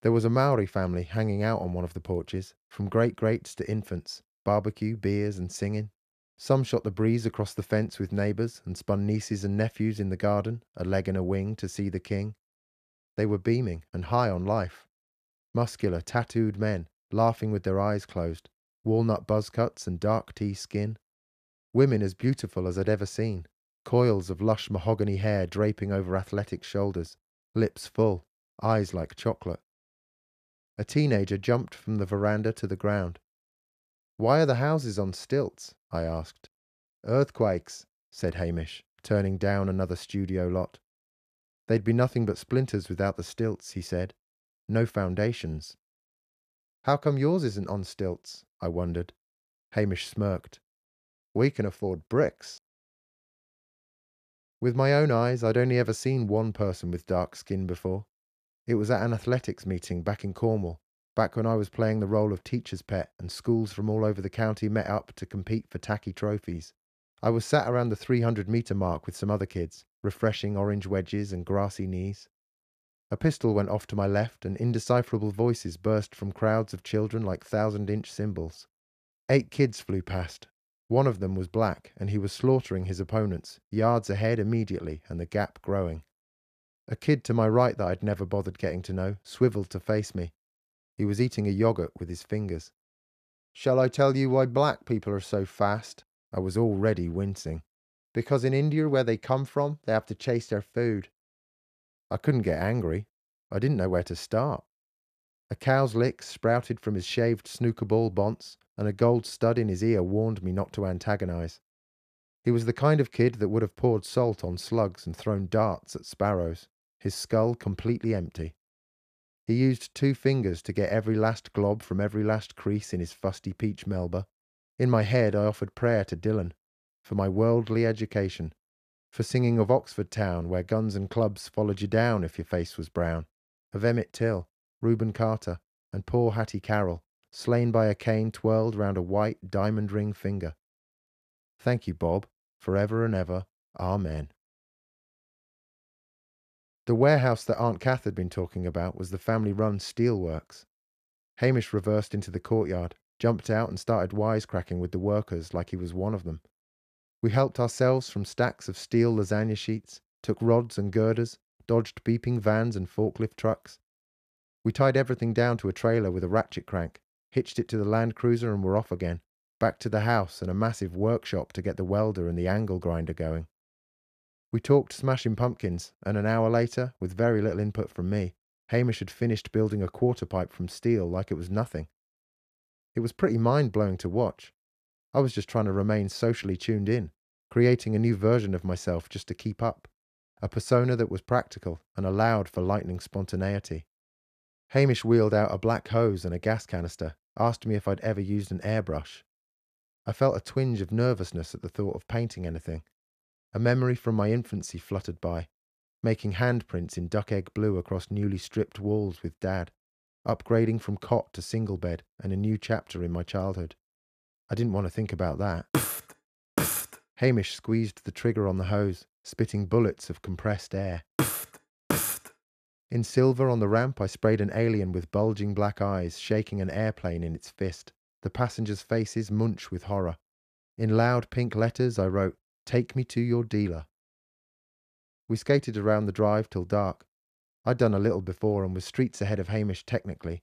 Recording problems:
none

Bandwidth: 14.5 kHz